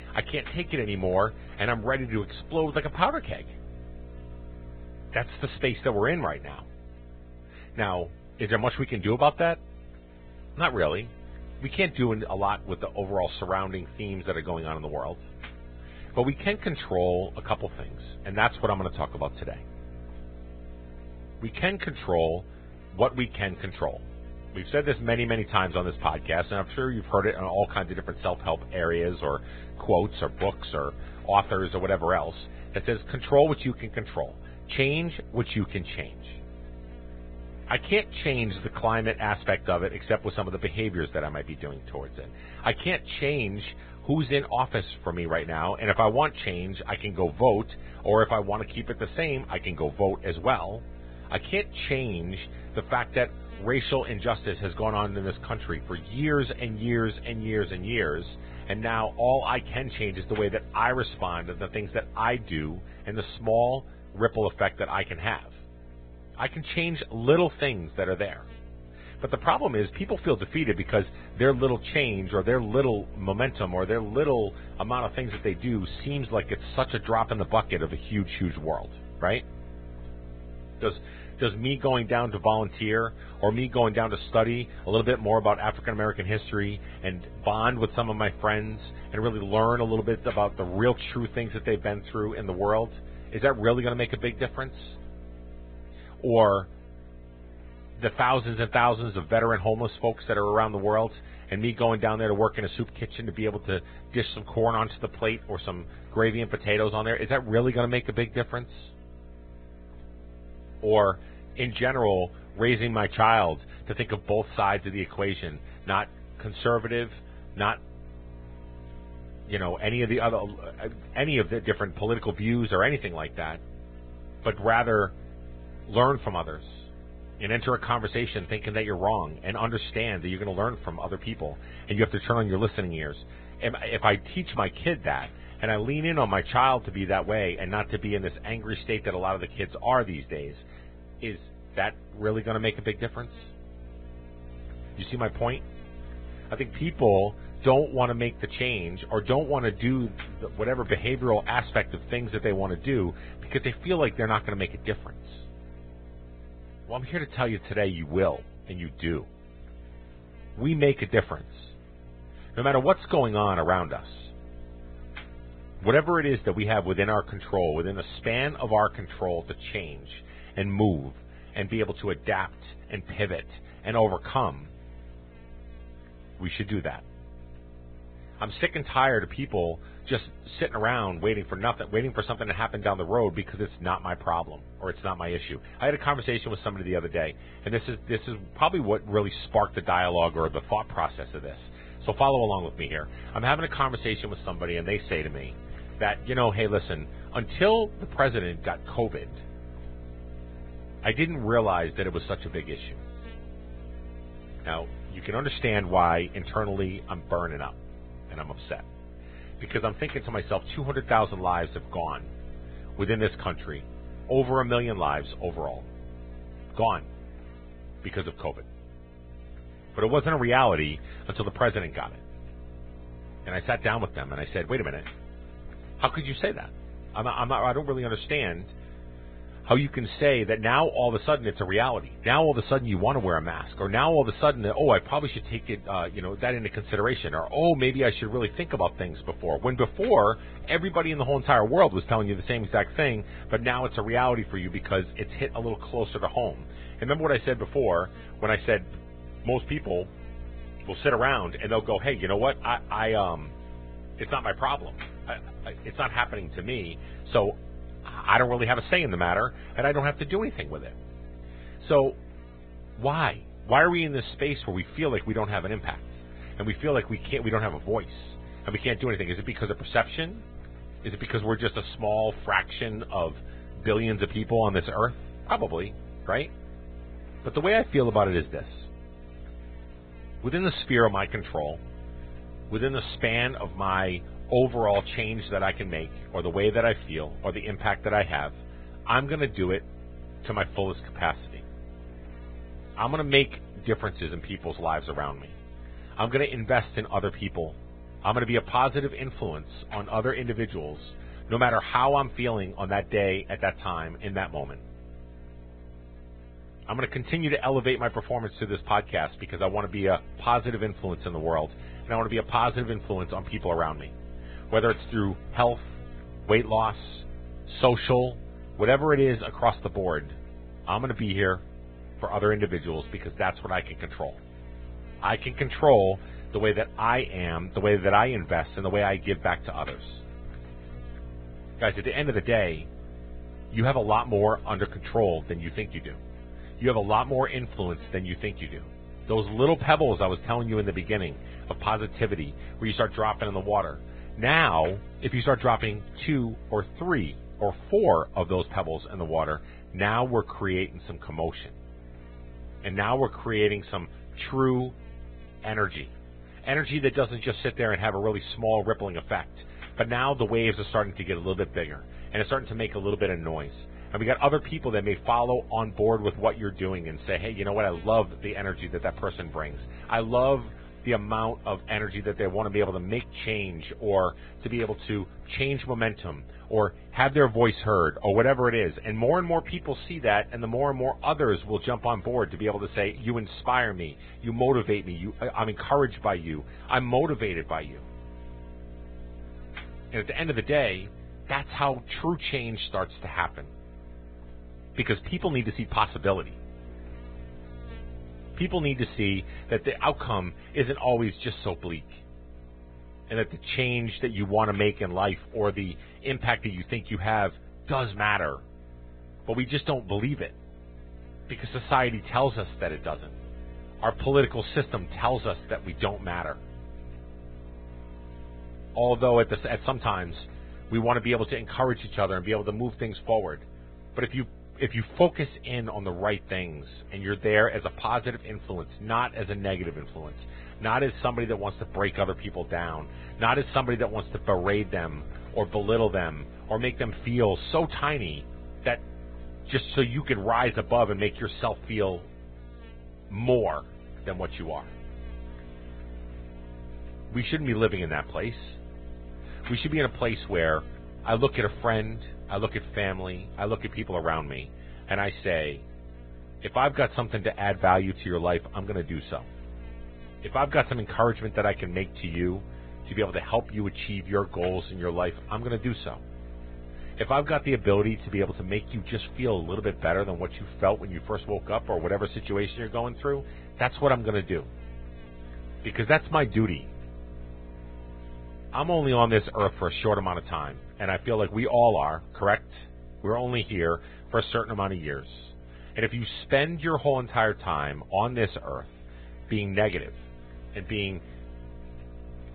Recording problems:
garbled, watery; badly
high frequencies cut off; severe; nothing above 3.5 kHz
electrical hum; faint; throughout; 60 Hz, 25 dB below the speech

